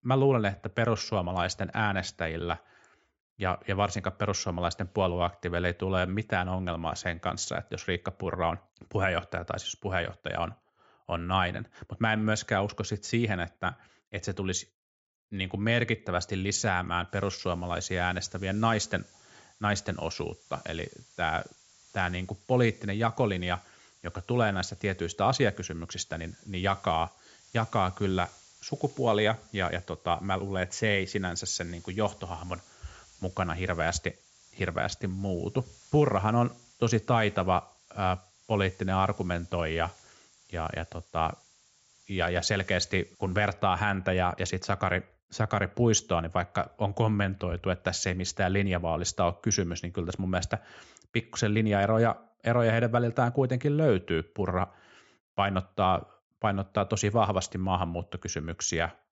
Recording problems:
high frequencies cut off; noticeable; nothing above 8 kHz
hiss; faint; from 17 to 44 s; 25 dB below the speech

